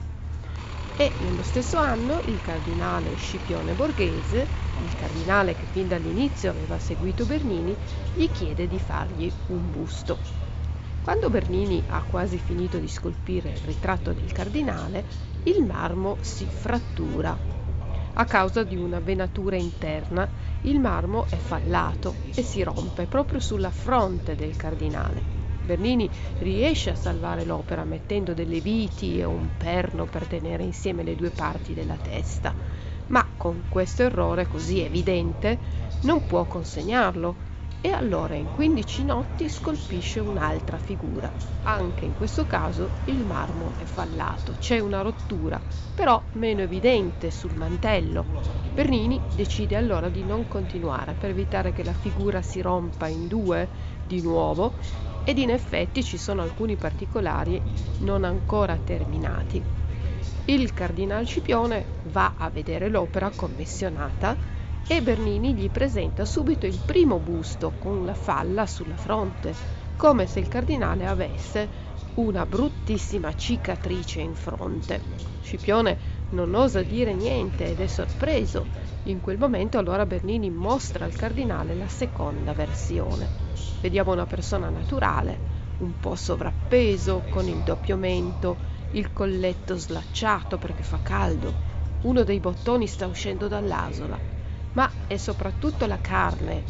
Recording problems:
high frequencies cut off; noticeable; nothing above 7.5 kHz
traffic noise; noticeable; throughout; 20 dB below the speech
voice in the background; noticeable; throughout; 15 dB below the speech
electrical hum; faint; throughout; 50 Hz, 20 dB below the speech
low rumble; faint; throughout; 20 dB below the speech

